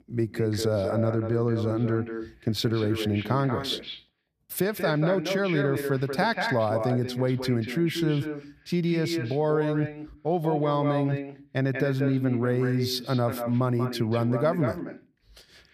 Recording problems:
echo of what is said; strong; throughout; 190 ms later, 7 dB below the speech

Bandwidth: 14.5 kHz